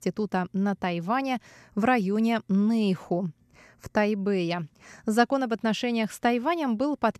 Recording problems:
none

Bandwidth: 13.5 kHz